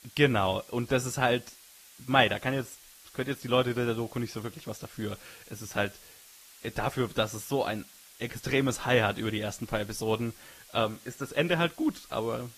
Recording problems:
garbled, watery; slightly; nothing above 14.5 kHz
hiss; faint; throughout; 20 dB below the speech

